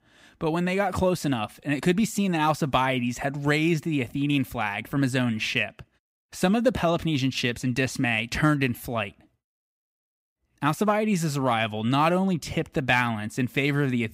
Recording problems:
none

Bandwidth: 15.5 kHz